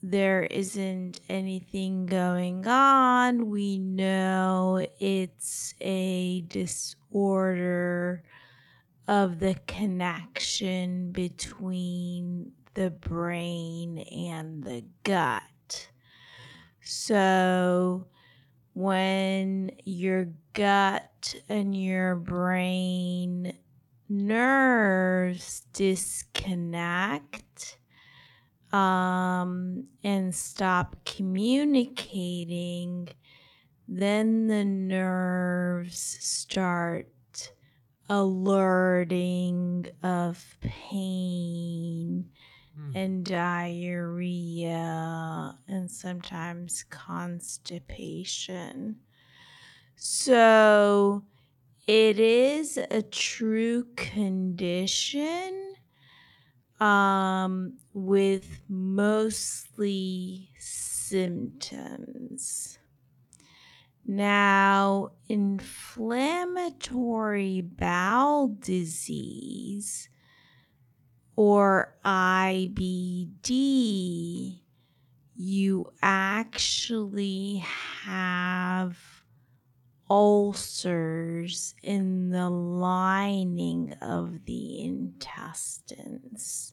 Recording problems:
wrong speed, natural pitch; too slow; 0.5 times normal speed

